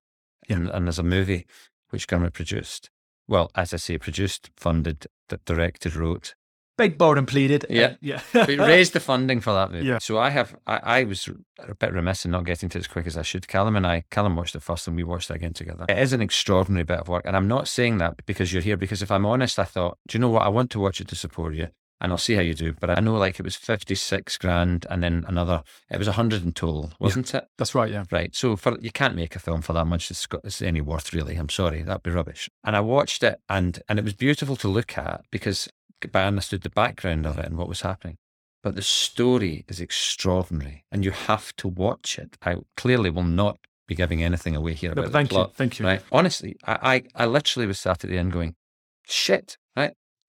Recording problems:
none

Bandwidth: 18 kHz